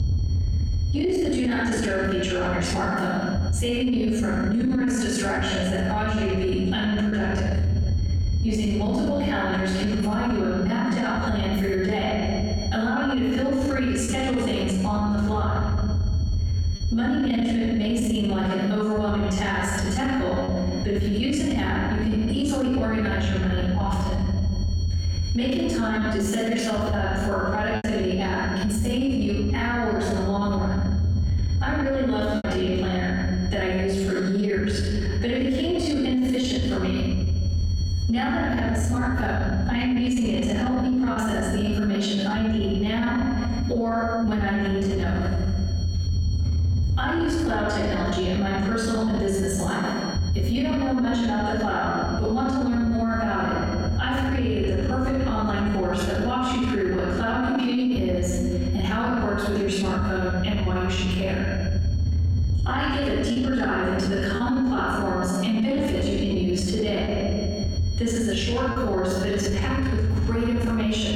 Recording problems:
room echo; strong; dies away in 1.1 s
off-mic speech; far
squashed, flat; somewhat
low rumble; noticeable; throughout; 20 dB below the speech
high-pitched whine; faint; throughout; 4.5 kHz, 20 dB below the speech
choppy; occasionally; 1% of the speech affected

